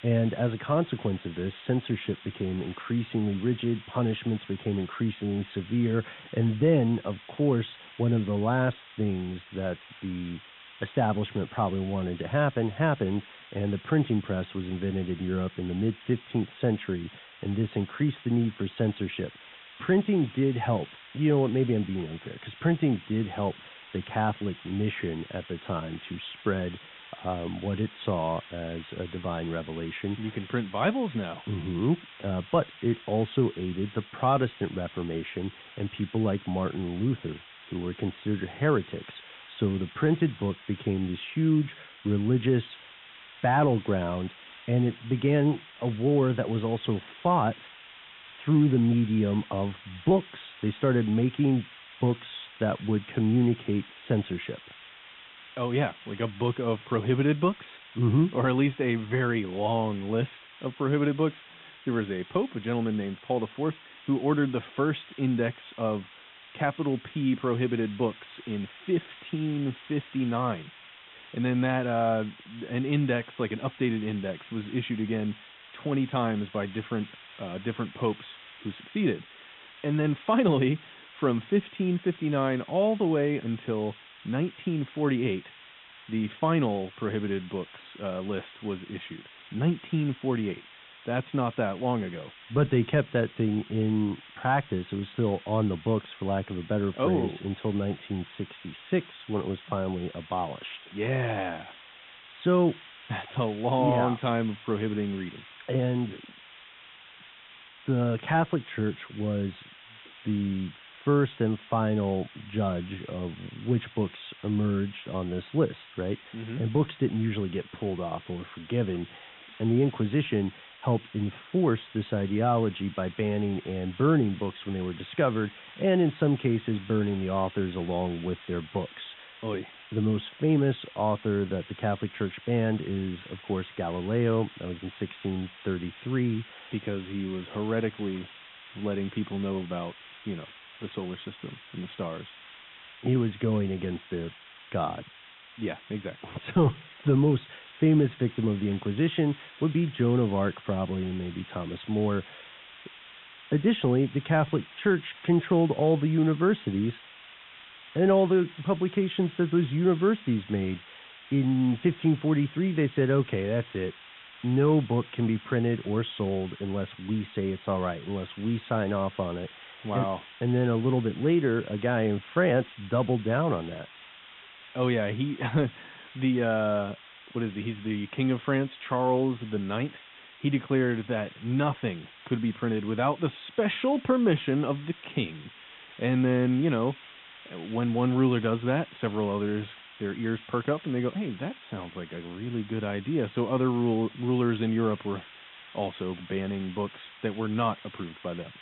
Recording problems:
high frequencies cut off; severe; nothing above 3.5 kHz
hiss; noticeable; throughout; 20 dB below the speech

